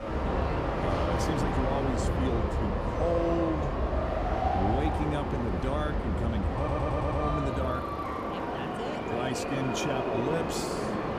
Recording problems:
train or aircraft noise; very loud; throughout; 3 dB above the speech
traffic noise; faint; throughout; 25 dB below the speech
audio stuttering; at 6.5 s

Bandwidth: 15 kHz